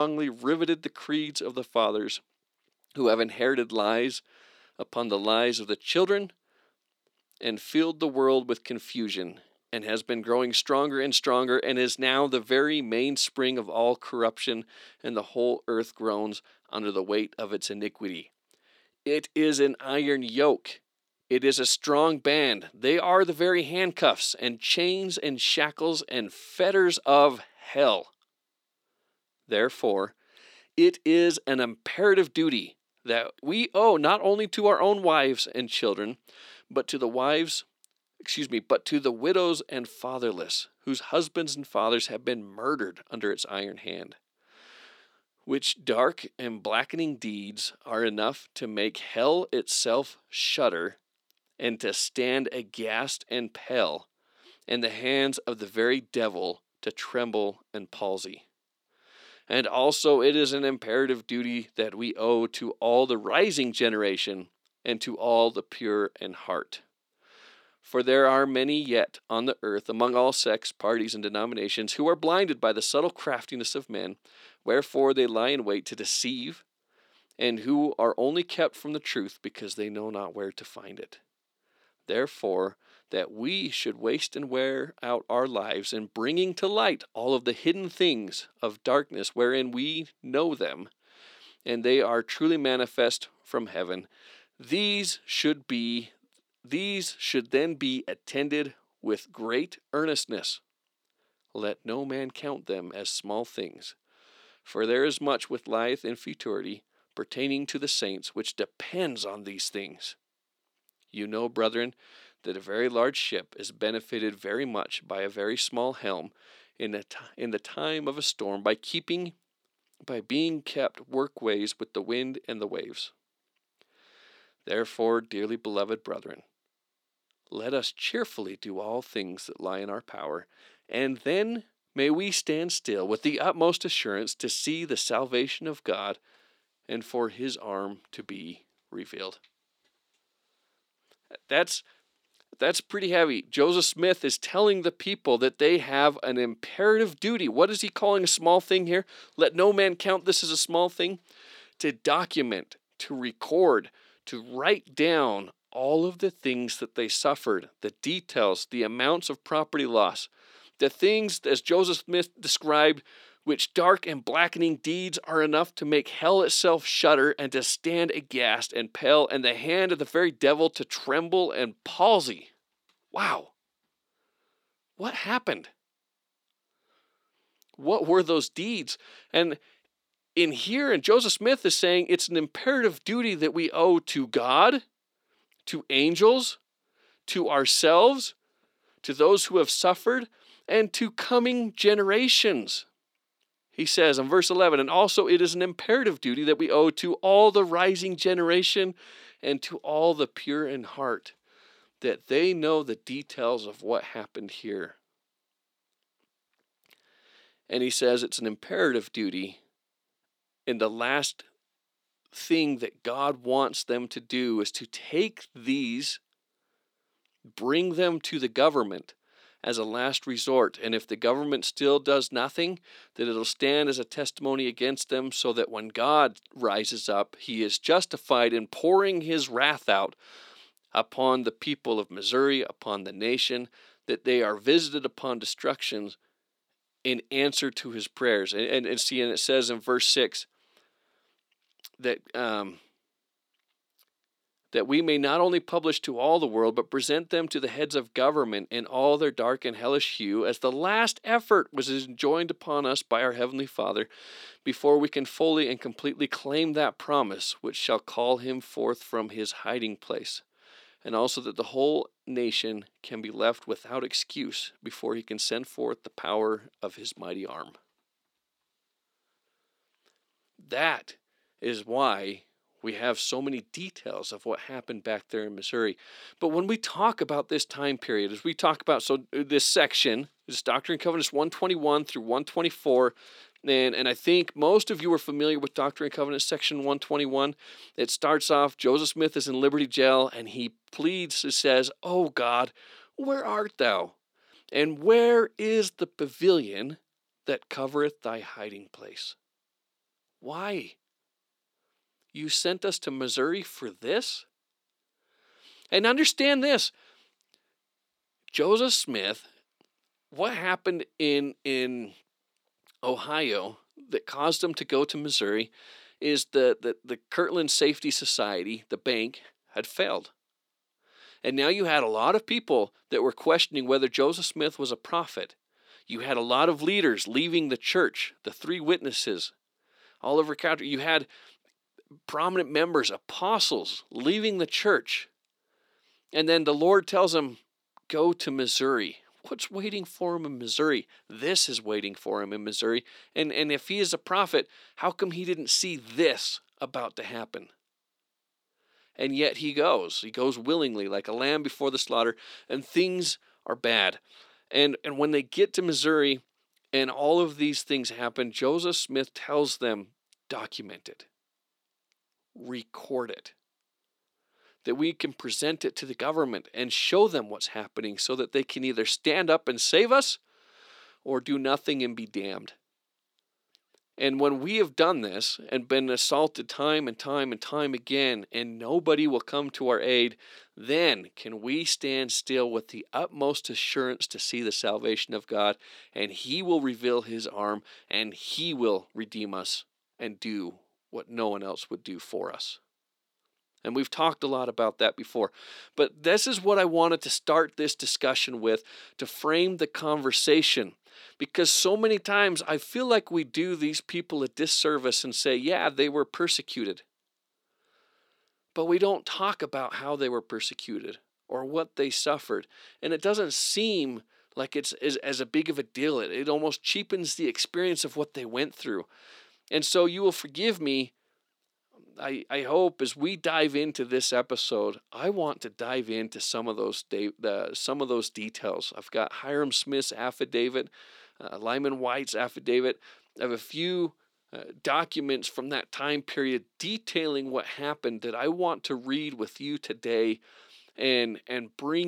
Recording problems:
thin; very slightly; fading below 300 Hz
abrupt cut into speech; at the start and the end

